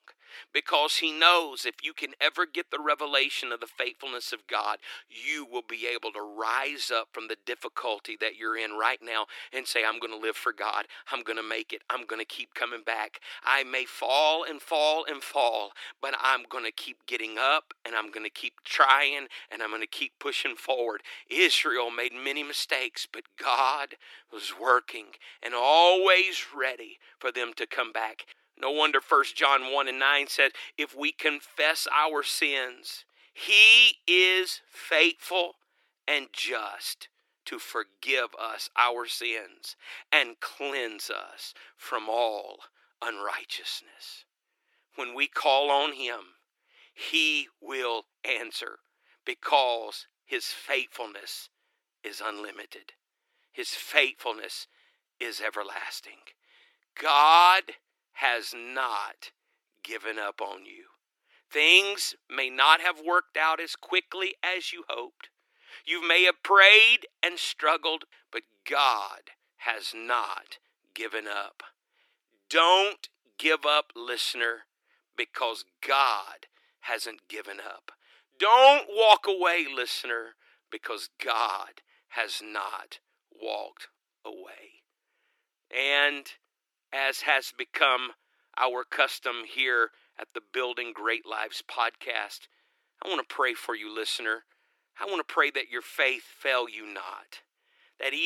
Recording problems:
thin; very; fading below 300 Hz
abrupt cut into speech; at the end

